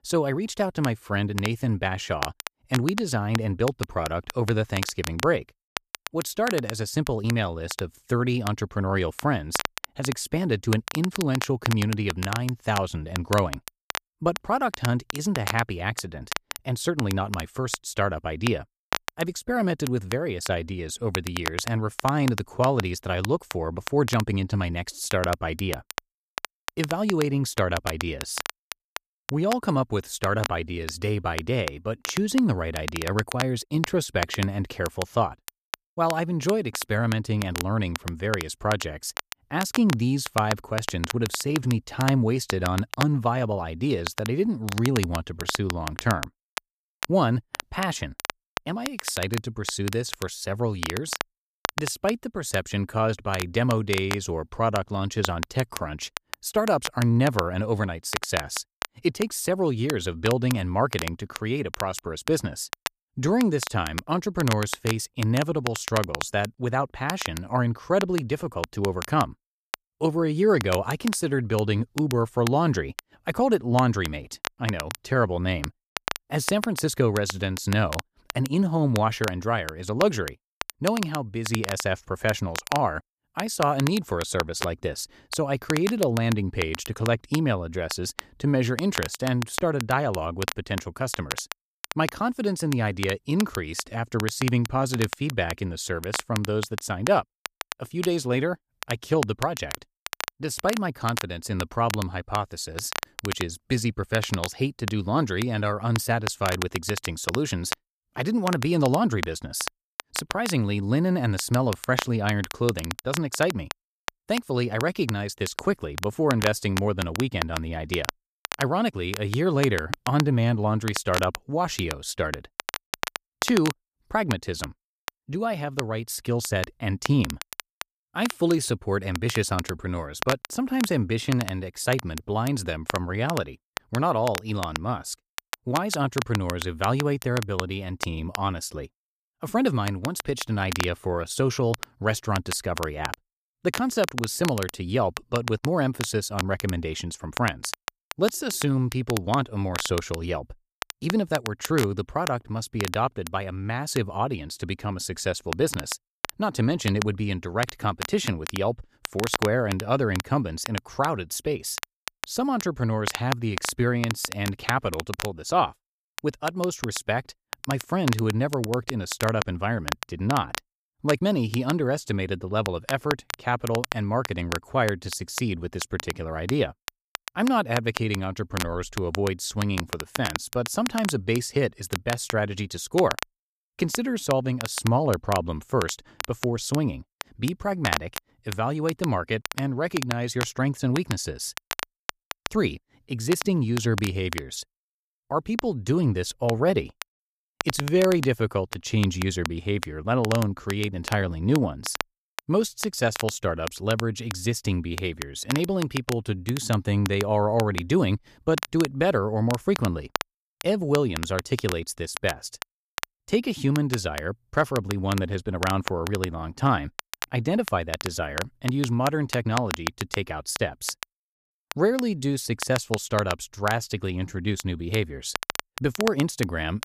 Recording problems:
crackle, like an old record; loud; 8 dB below the speech

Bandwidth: 14.5 kHz